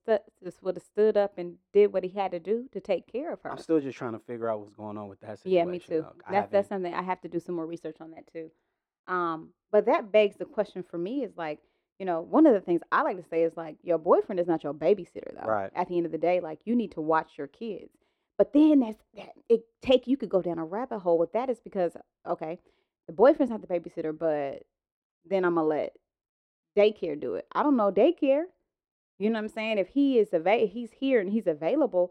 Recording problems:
muffled; slightly; fading above 1 kHz

